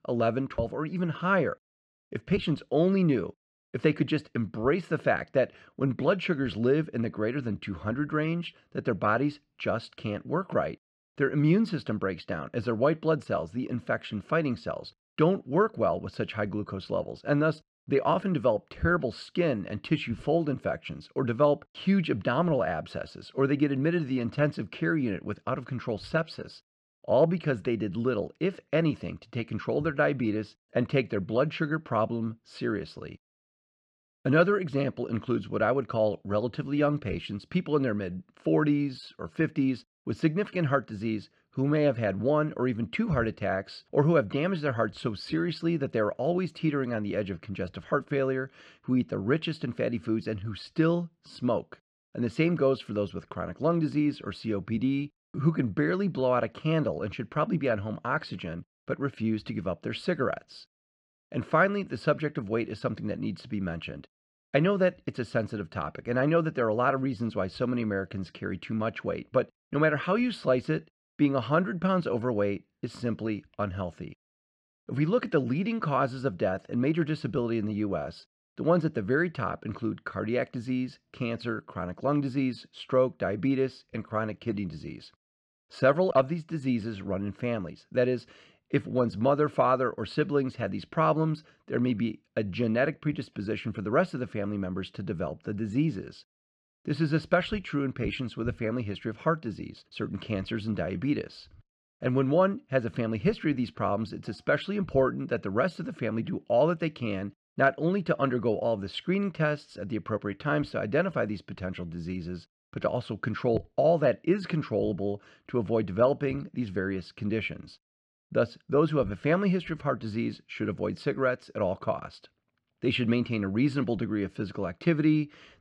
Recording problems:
muffled; very slightly; fading above 4 kHz

